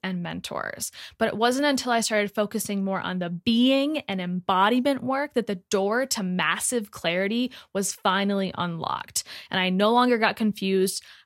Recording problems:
none

